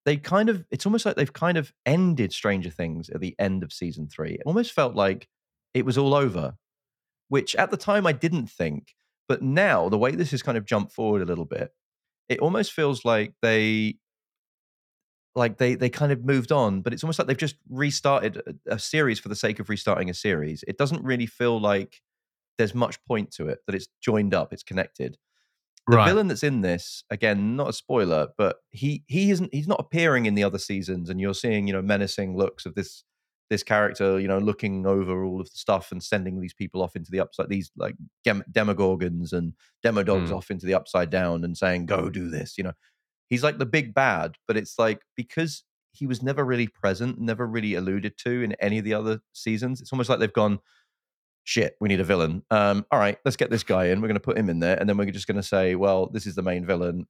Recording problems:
none

